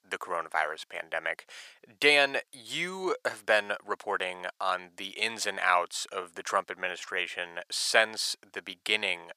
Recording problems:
thin; very; fading below 800 Hz

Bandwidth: 15 kHz